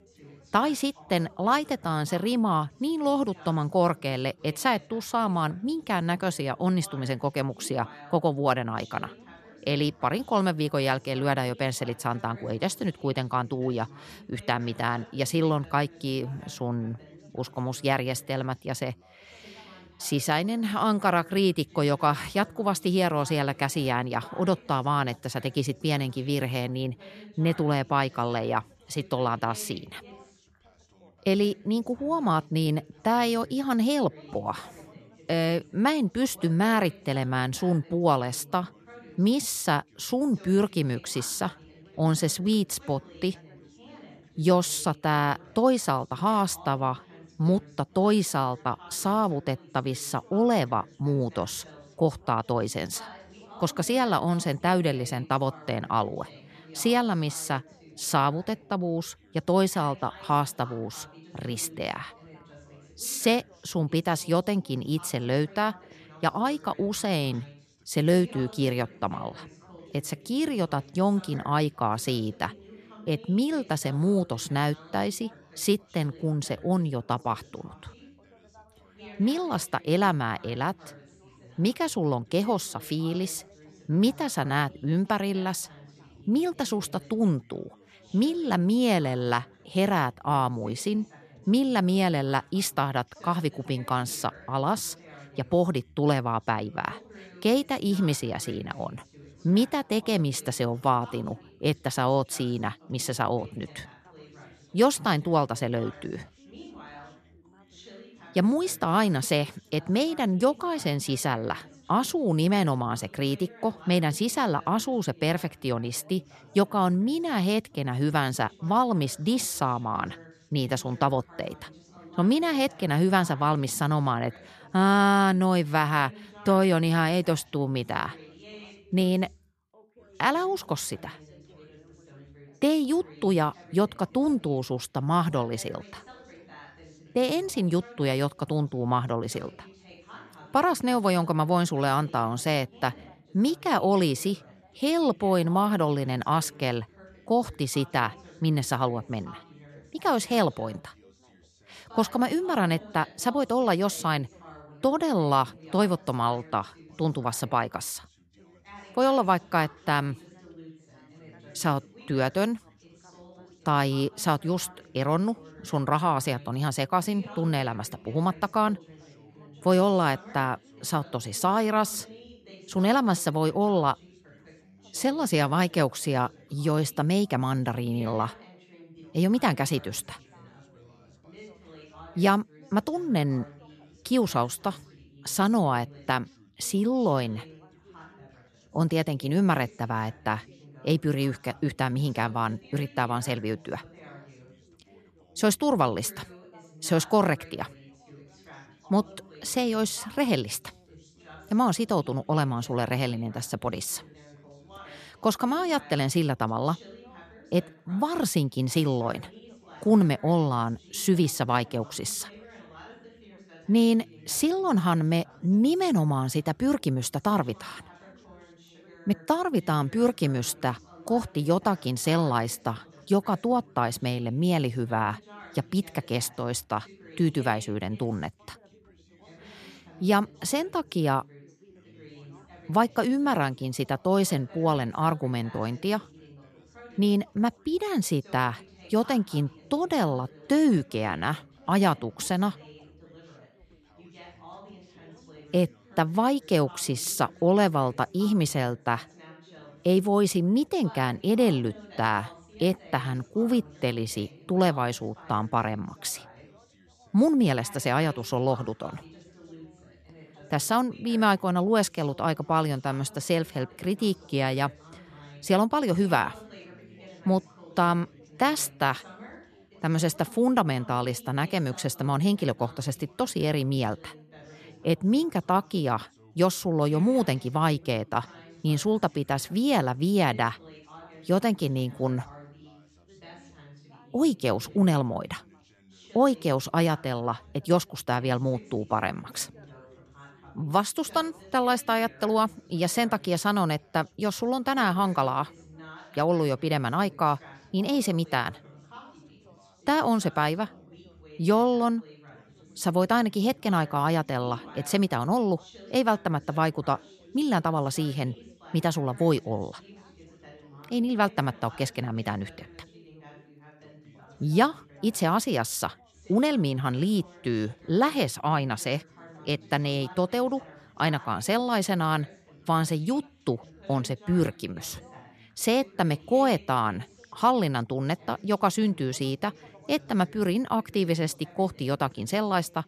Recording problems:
background chatter; faint; throughout; 3 voices, 25 dB below the speech

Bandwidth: 14 kHz